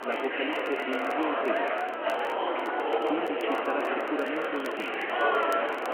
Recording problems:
phone-call audio
murmuring crowd; very loud; throughout; 6 dB above the speech
traffic noise; noticeable; from 4 s on; 15 dB below the speech
crackle, like an old record; noticeable; 20 dB below the speech
uneven, jittery; slightly; from 0.5 to 5 s

